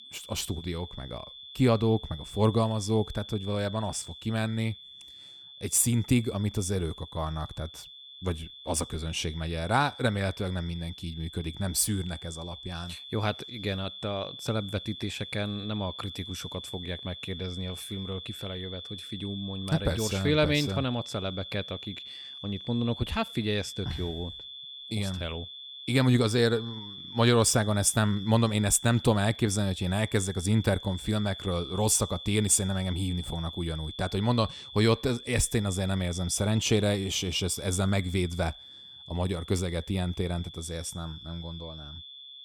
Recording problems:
high-pitched whine; noticeable; throughout; 3.5 kHz, 15 dB below the speech

